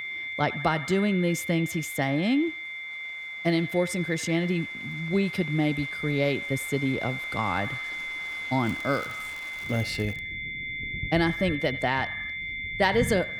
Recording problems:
echo of what is said; faint; throughout; 80 ms later, 20 dB below the speech
high-pitched whine; loud; throughout; 2 kHz, 5 dB below the speech
rain or running water; noticeable; throughout; 15 dB below the speech
crackling; faint; from 8.5 to 10 s; 25 dB below the speech

